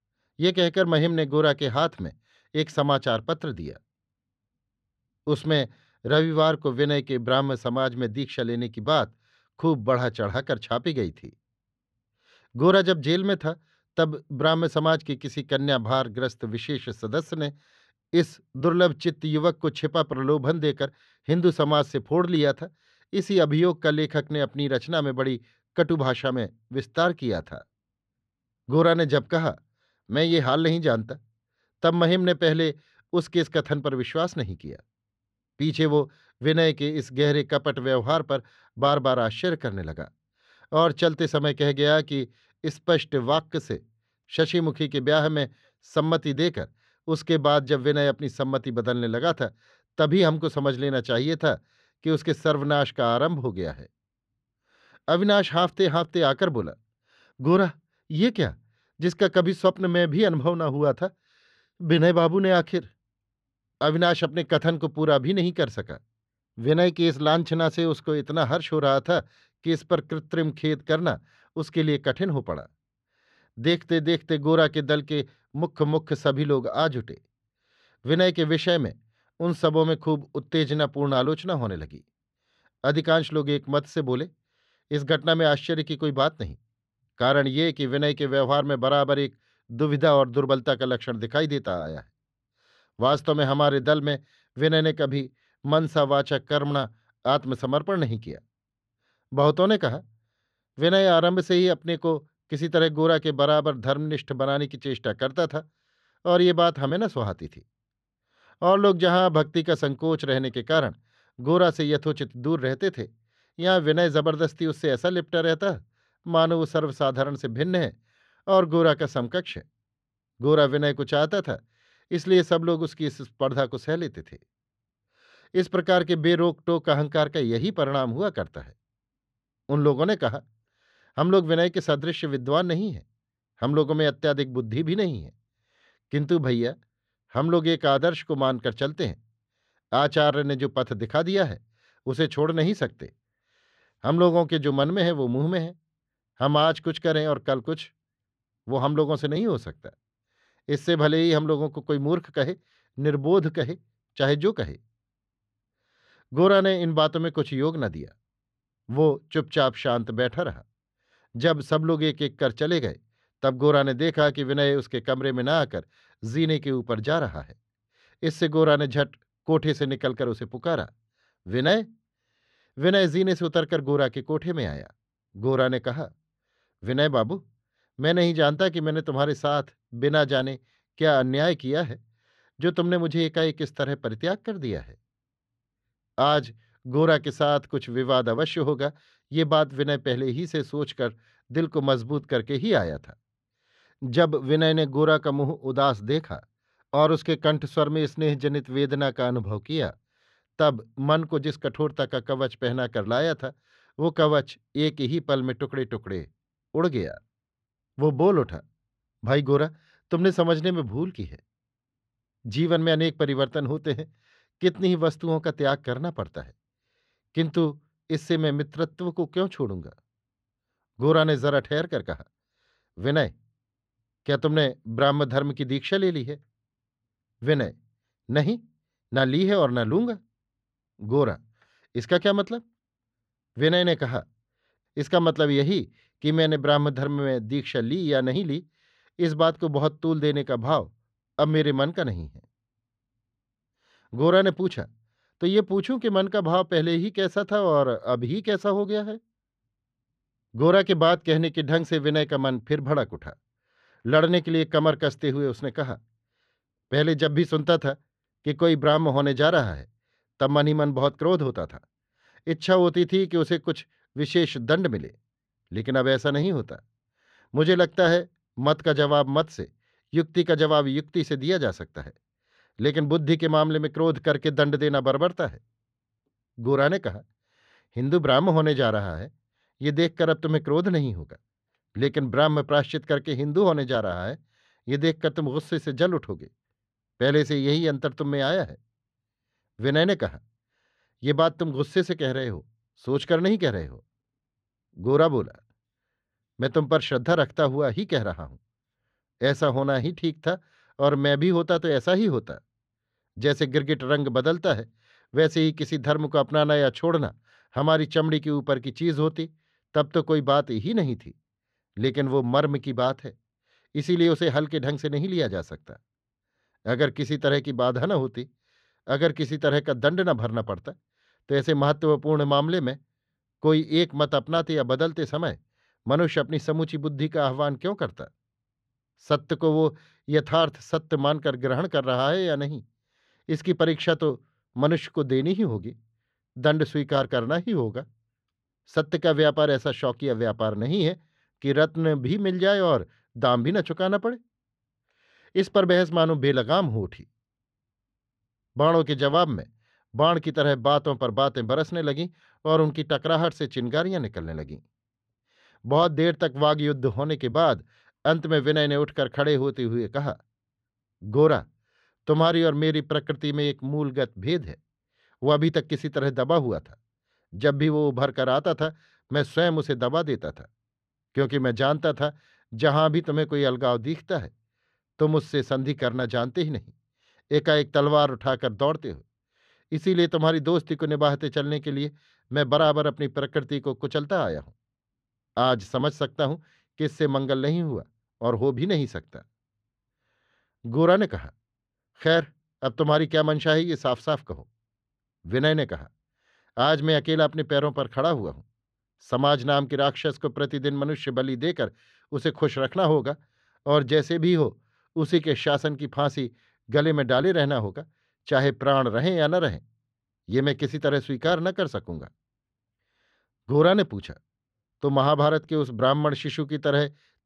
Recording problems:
muffled; slightly; fading above 3 kHz

